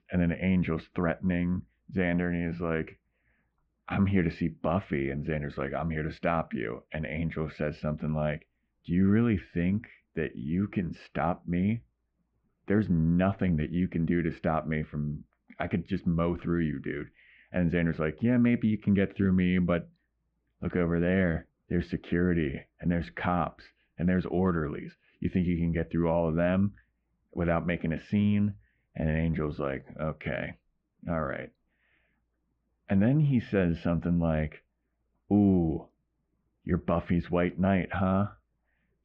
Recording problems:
muffled; very; fading above 2.5 kHz

